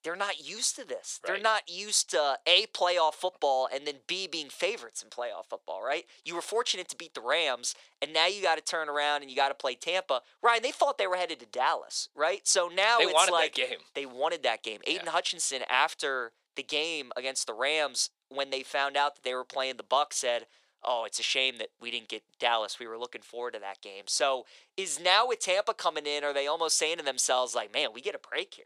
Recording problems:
thin; very; fading below 500 Hz

